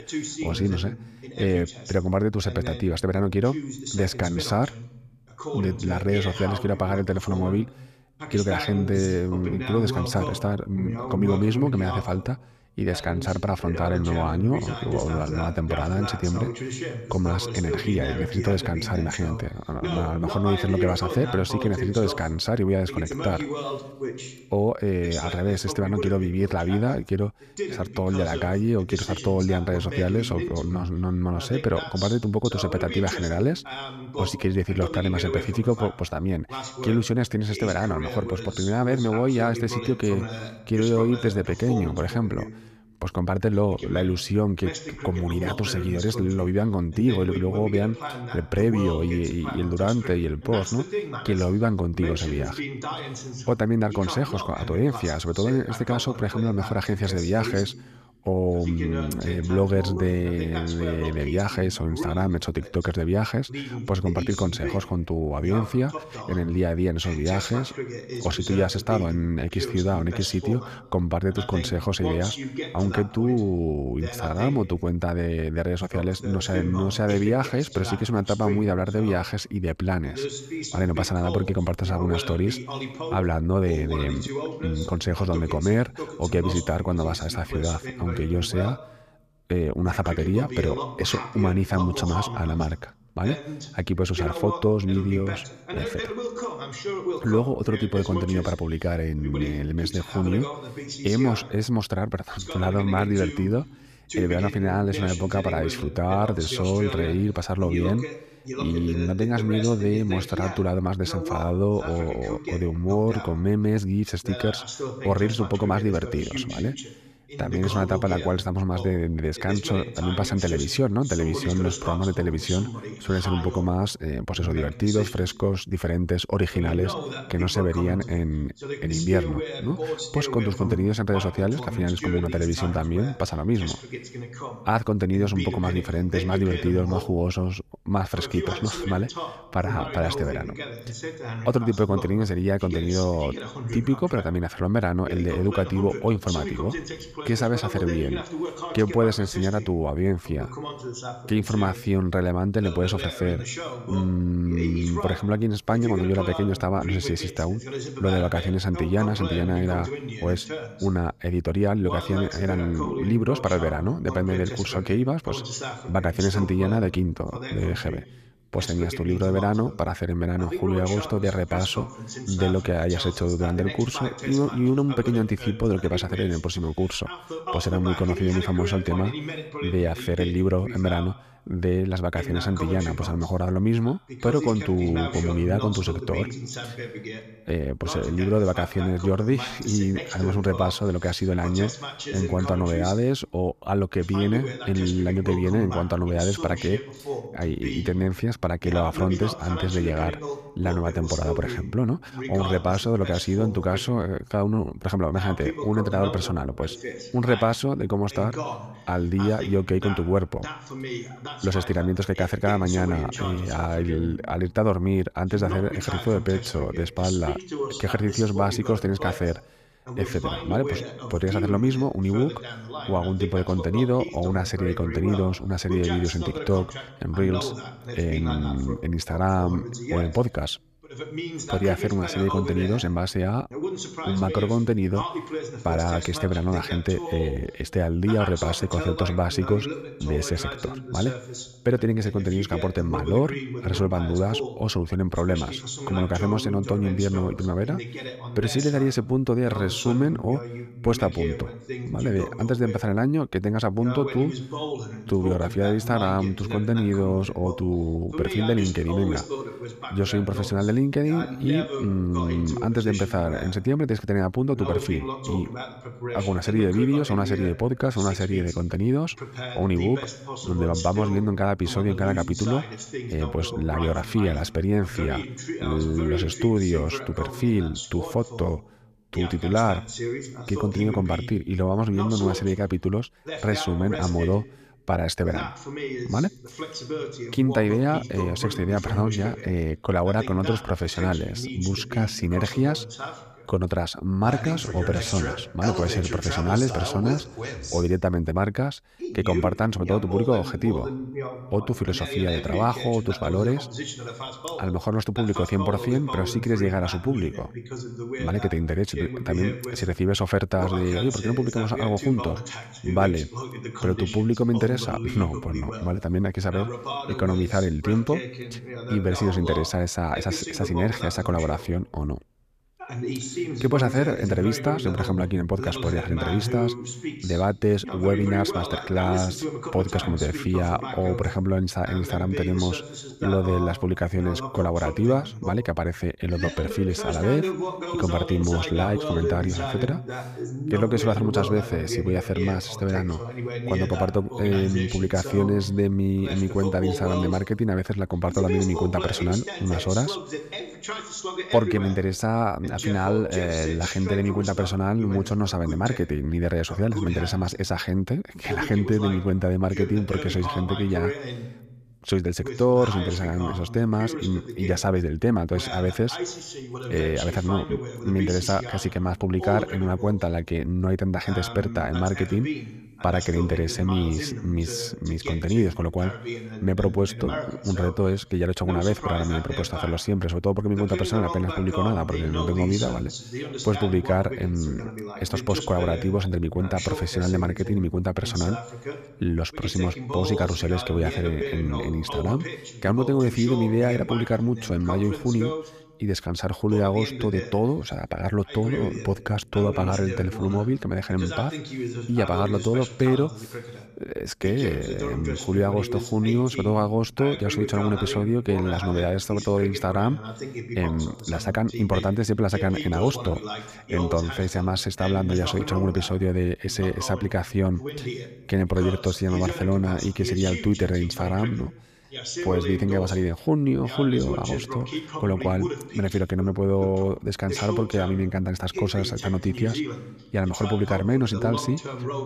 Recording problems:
voice in the background; loud; throughout; 8 dB below the speech

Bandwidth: 14.5 kHz